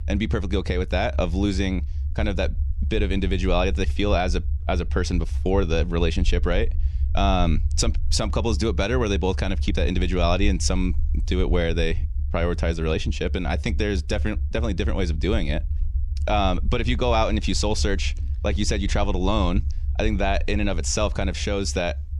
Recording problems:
low rumble; faint; throughout; 20 dB below the speech

